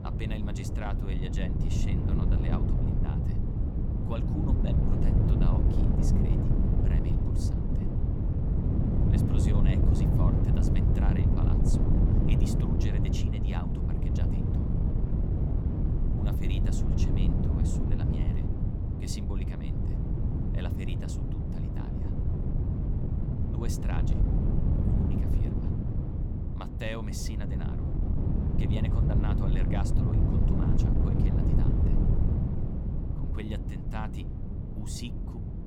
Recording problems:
wind noise on the microphone; heavy; 4 dB above the speech

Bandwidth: 18.5 kHz